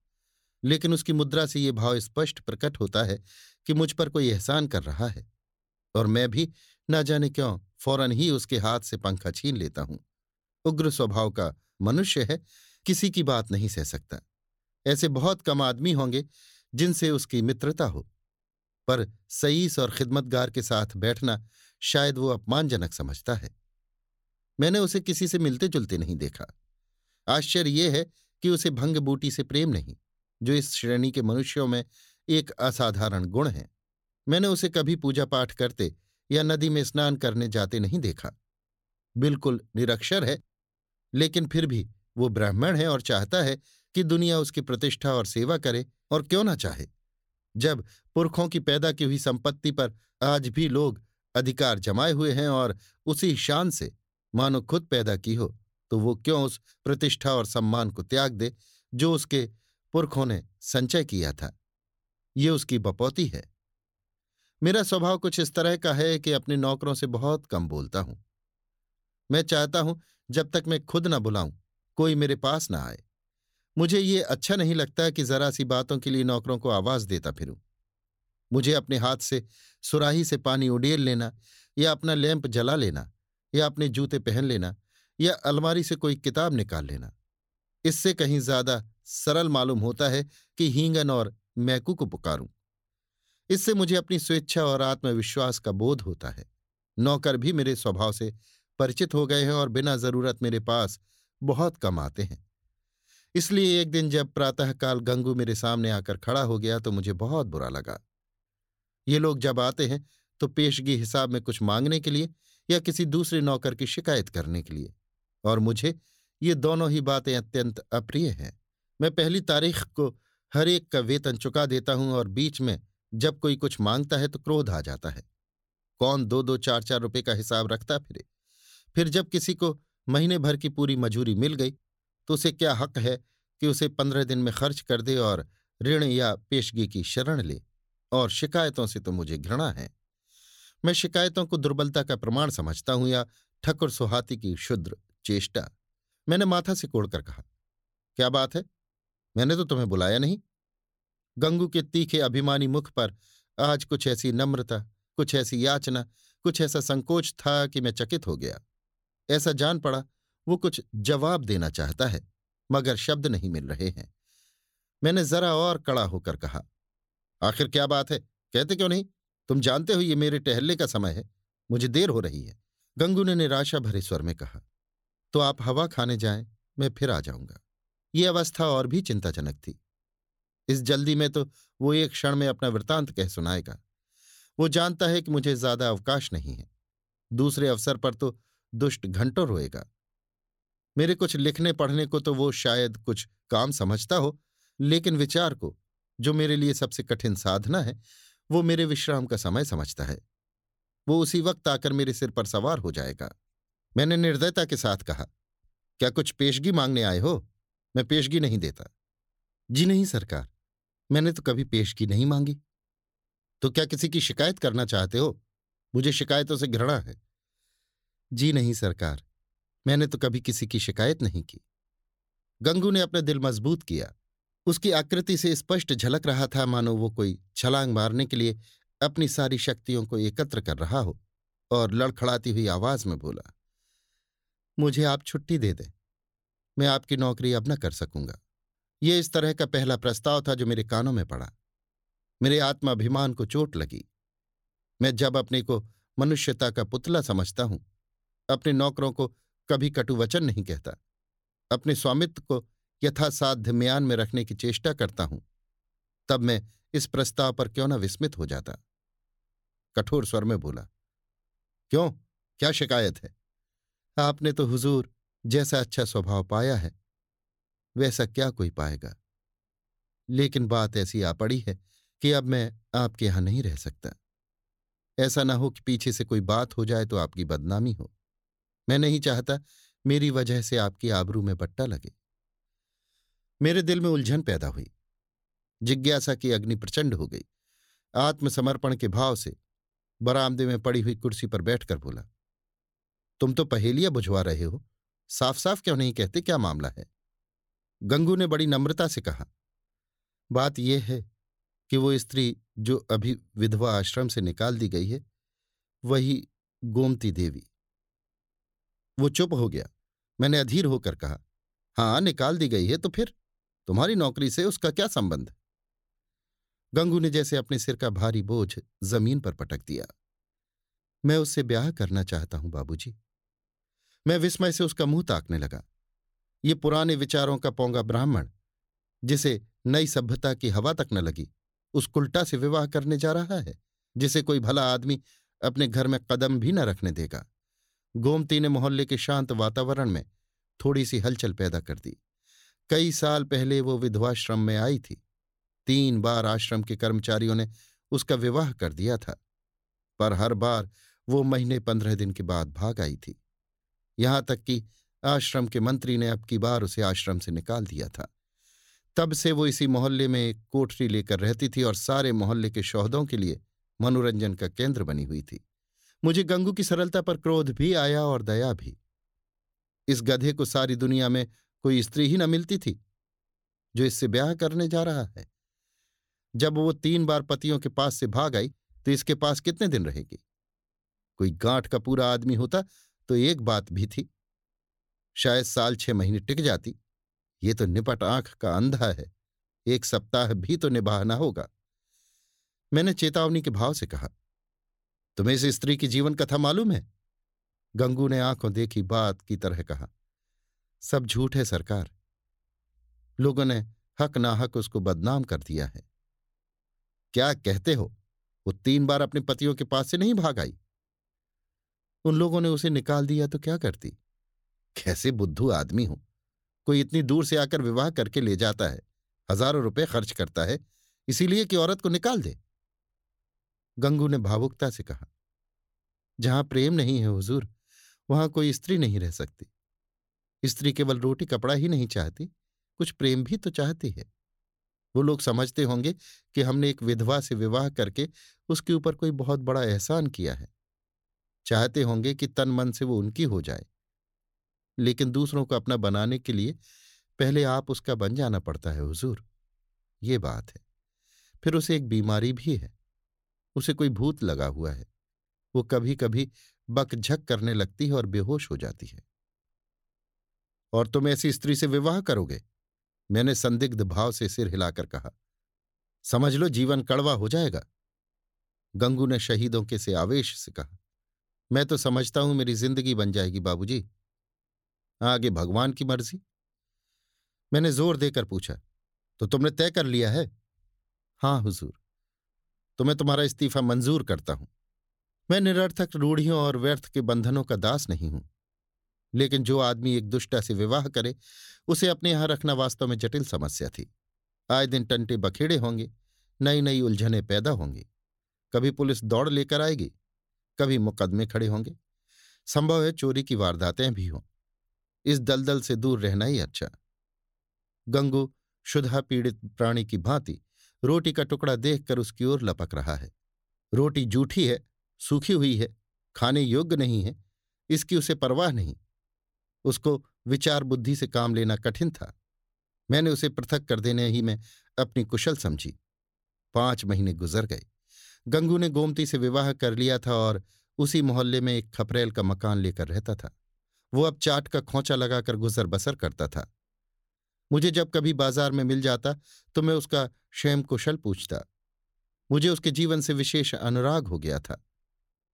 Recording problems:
none

